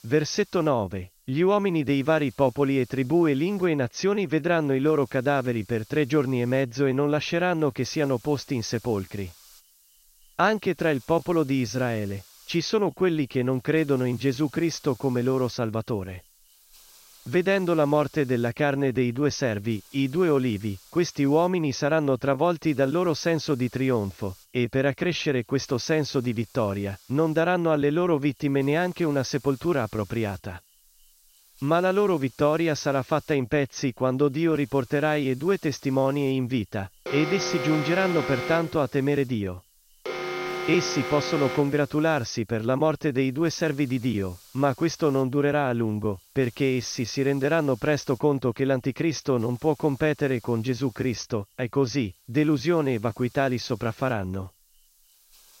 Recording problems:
high frequencies cut off; noticeable; nothing above 6.5 kHz
hiss; faint; throughout; 25 dB below the speech
alarm; noticeable; from 37 to 42 s; peak 4 dB below the speech

